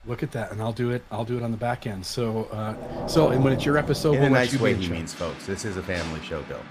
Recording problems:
rain or running water; loud; throughout; 8 dB below the speech

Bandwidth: 15 kHz